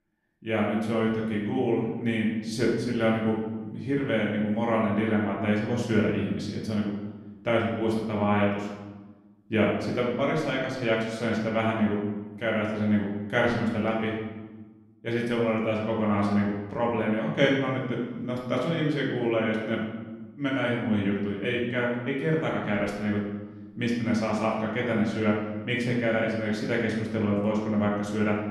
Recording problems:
off-mic speech; far
room echo; noticeable; dies away in 1 s

